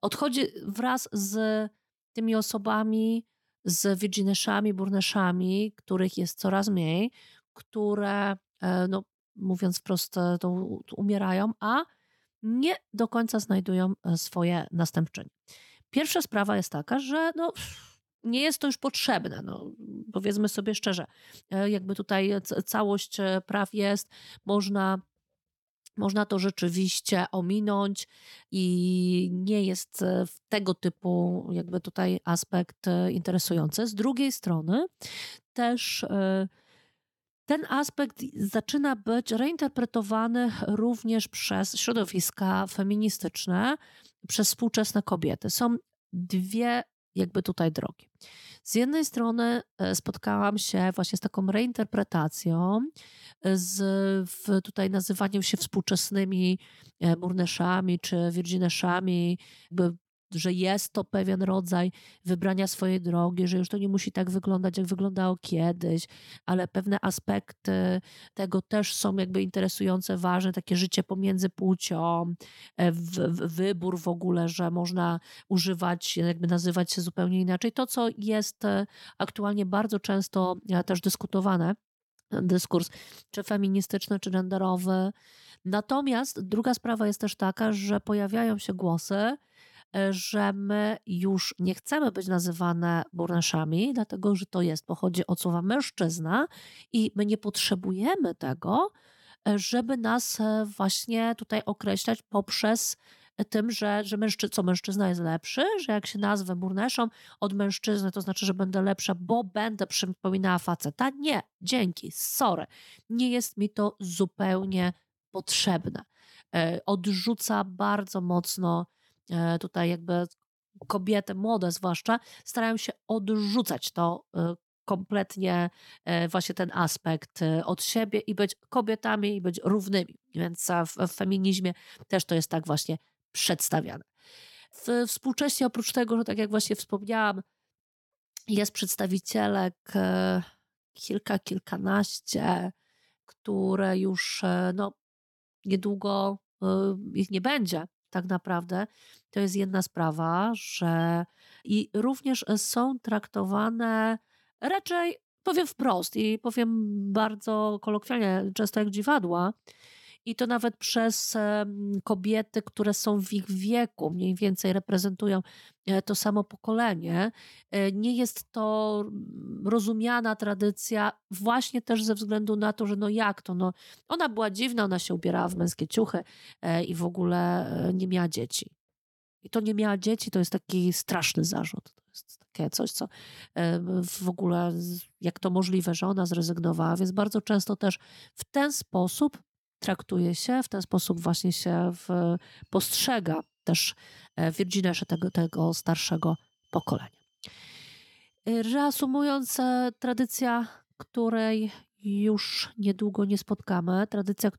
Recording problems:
none

